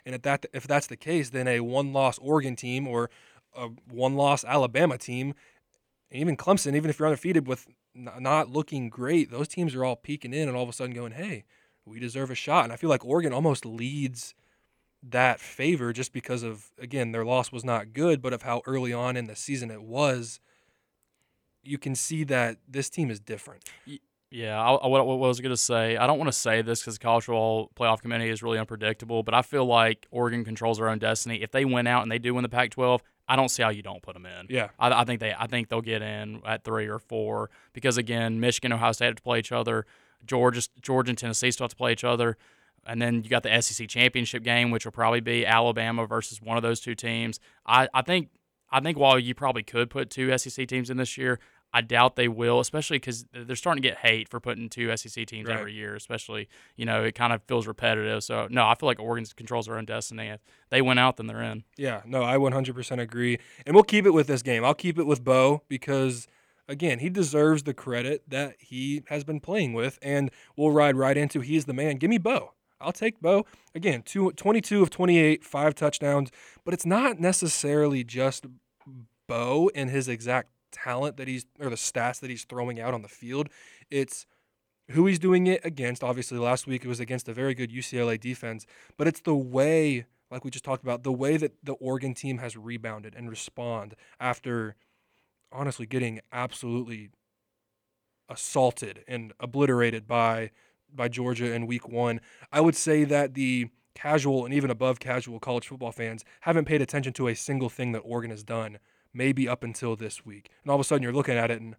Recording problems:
none

